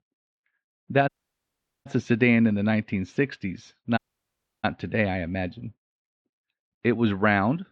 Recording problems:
muffled; very; fading above 3.5 kHz
audio cutting out; at 1 s for 1 s and at 4 s for 0.5 s

